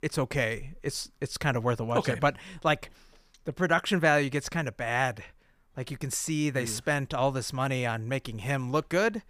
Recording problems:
none

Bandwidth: 15 kHz